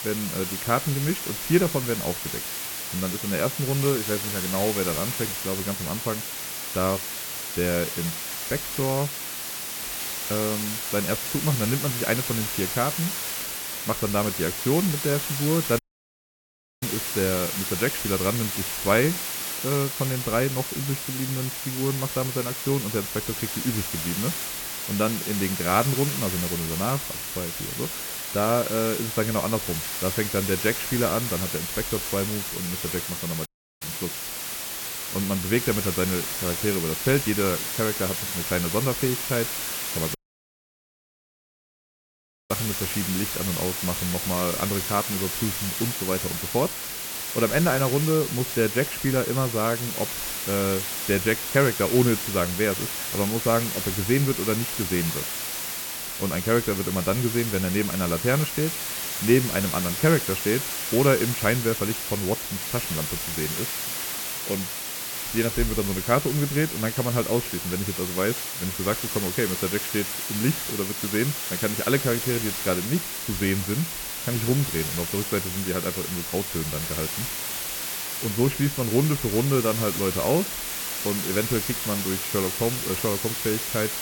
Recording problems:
muffled; very; fading above 2.5 kHz
hiss; loud; throughout; 2 dB below the speech
audio cutting out; at 16 s for 1 s, at 33 s and at 40 s for 2.5 s

